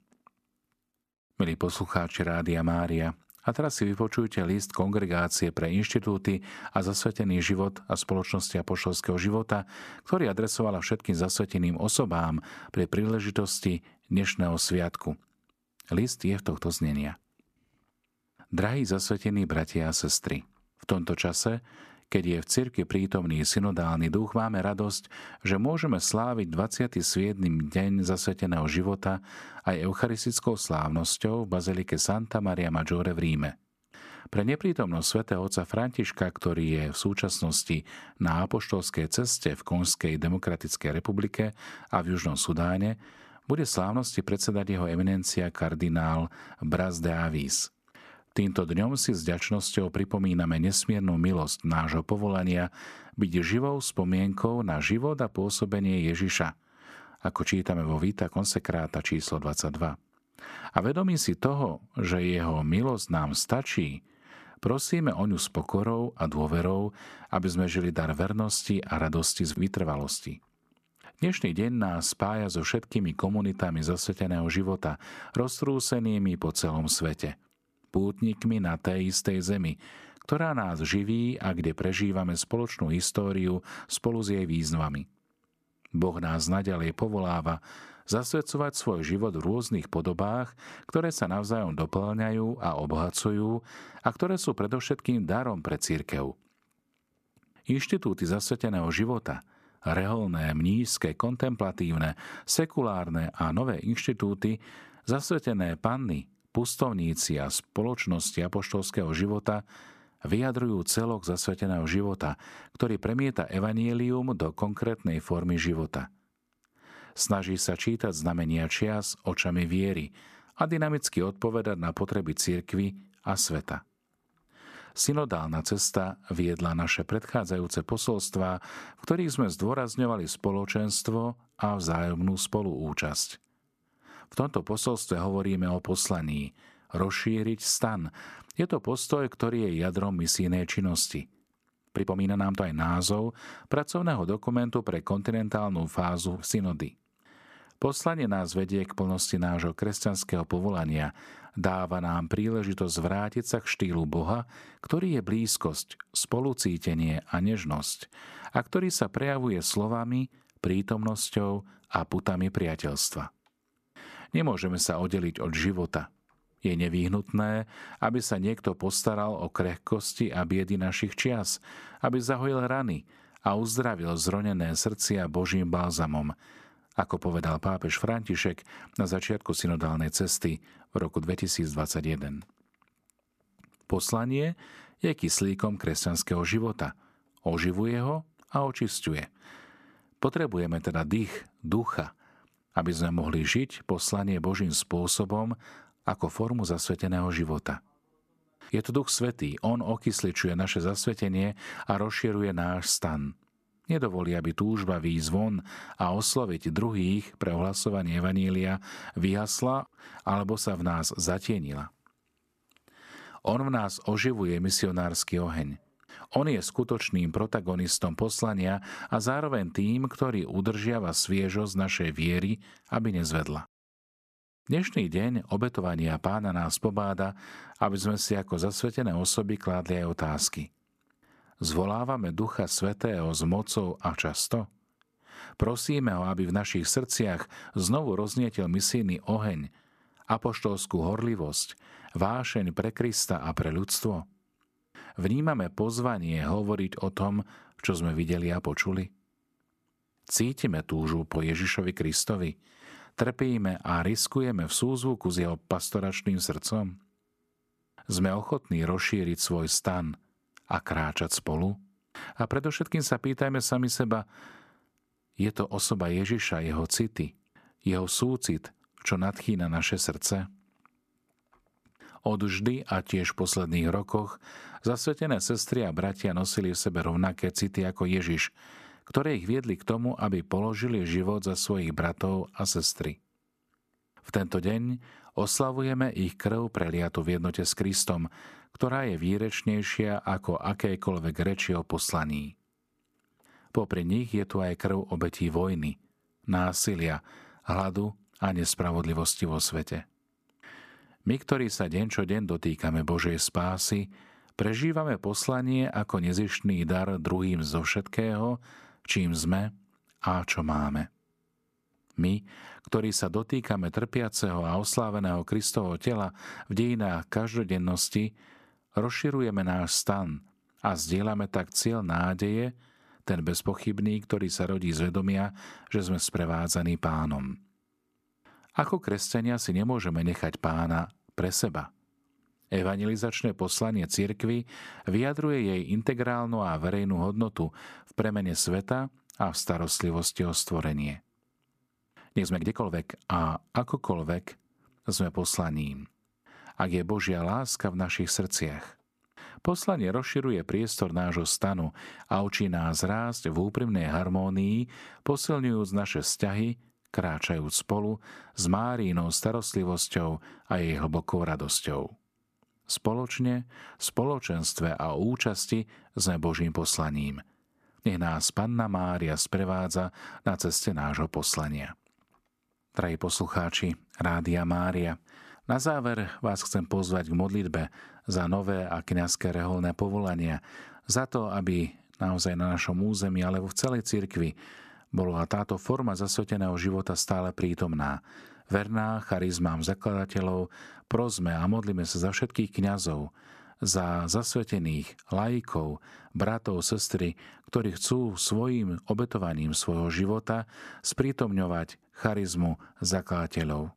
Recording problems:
uneven, jittery; strongly; from 2:22 to 5:43

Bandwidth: 14.5 kHz